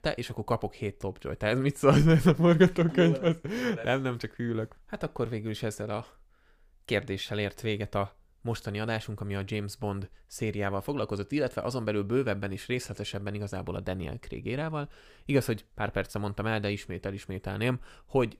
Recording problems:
none

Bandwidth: 15 kHz